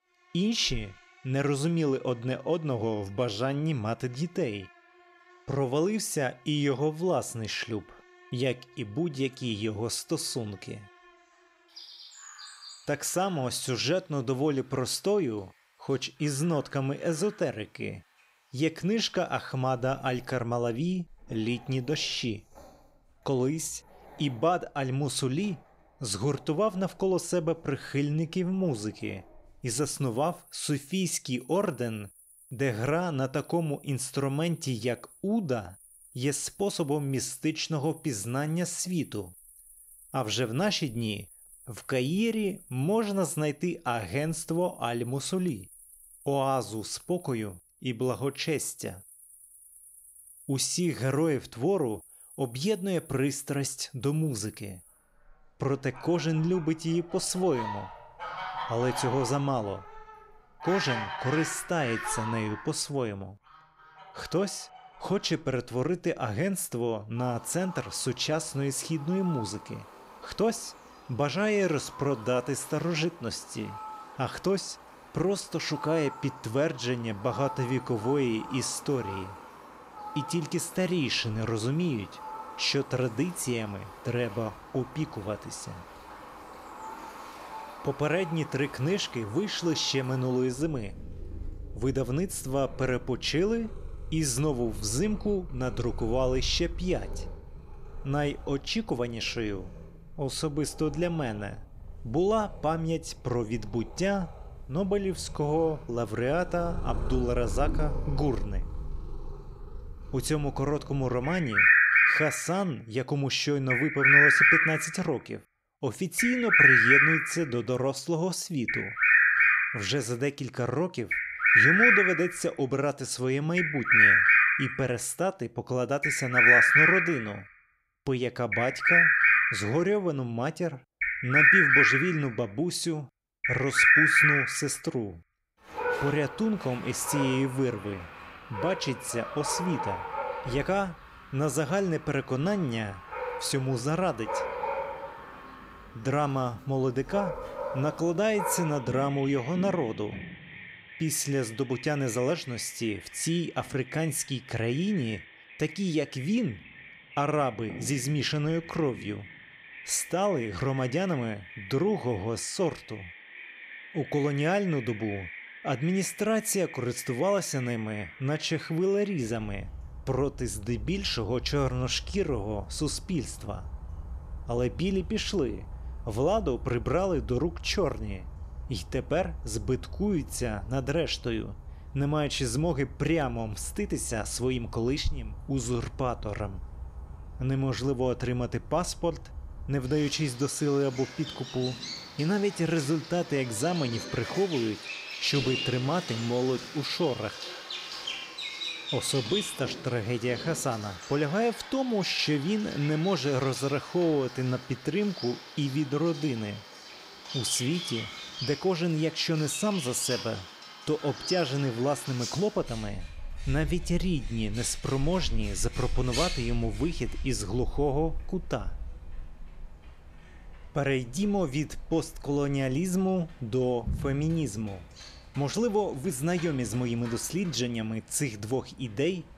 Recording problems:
animal sounds; very loud; throughout; 3 dB above the speech

